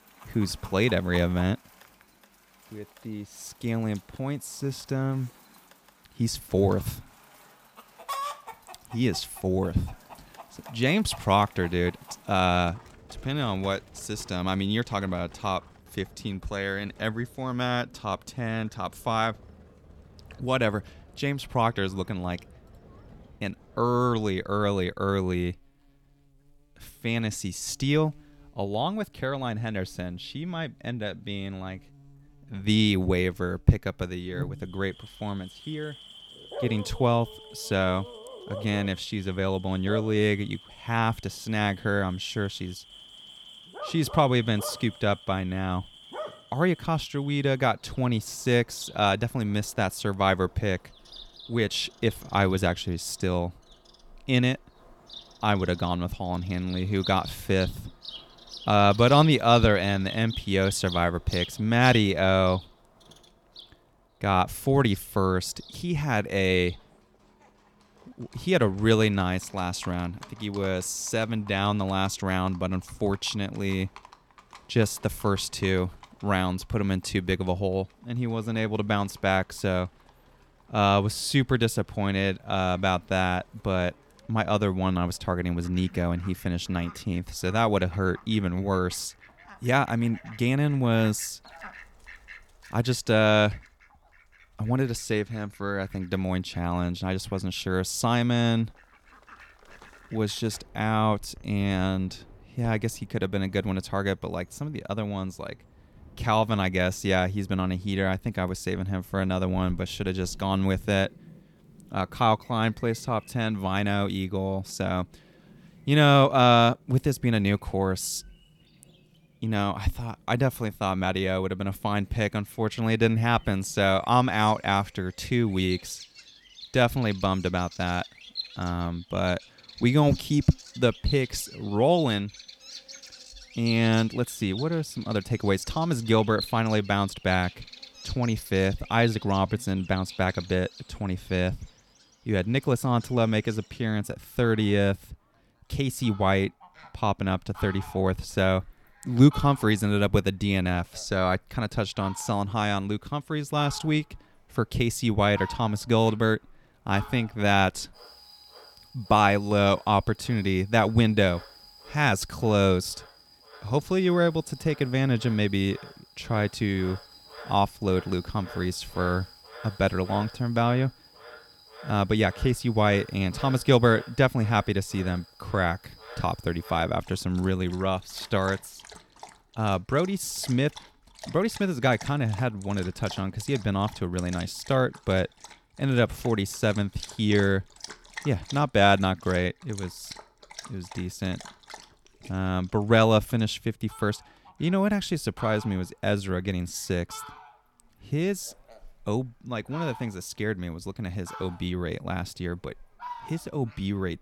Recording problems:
animal sounds; noticeable; throughout; 20 dB below the speech

